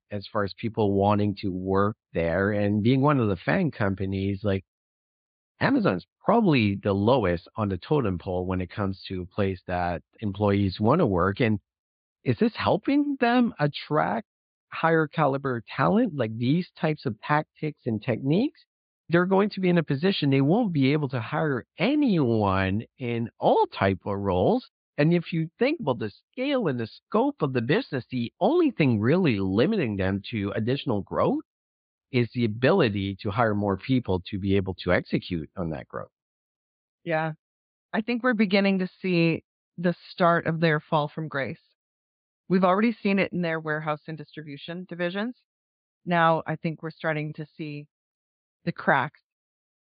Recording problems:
high frequencies cut off; severe; nothing above 4.5 kHz

